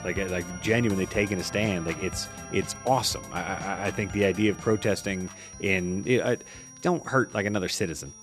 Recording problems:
high-pitched whine; noticeable; throughout; 5.5 kHz, 15 dB below the speech
background music; noticeable; throughout; 15 dB below the speech

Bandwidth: 13.5 kHz